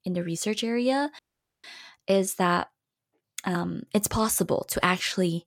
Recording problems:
audio cutting out; at 1 s

